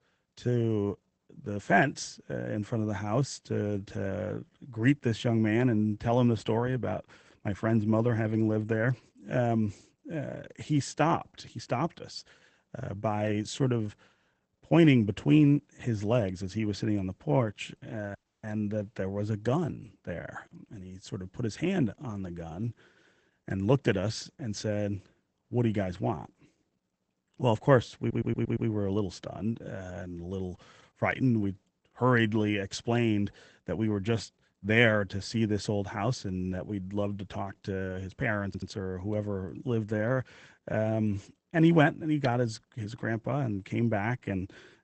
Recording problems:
garbled, watery; badly; nothing above 8 kHz
audio cutting out; at 18 s
audio stuttering; at 28 s and at 38 s

